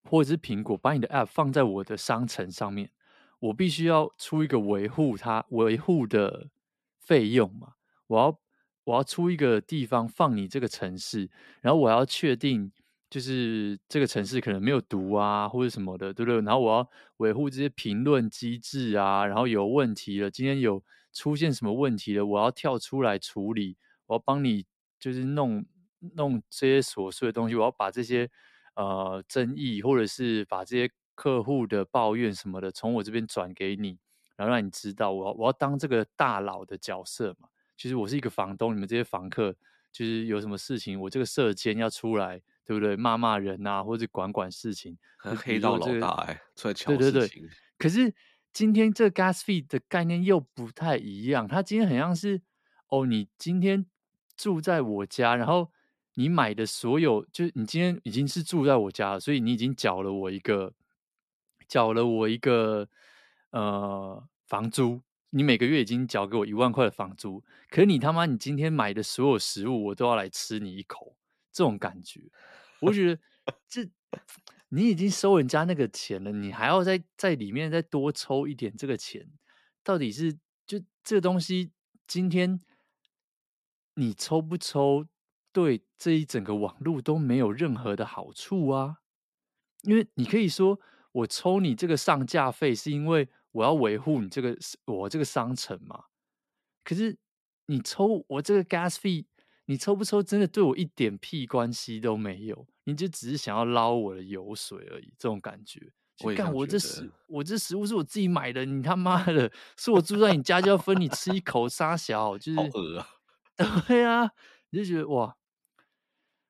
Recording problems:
none

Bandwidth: 13.5 kHz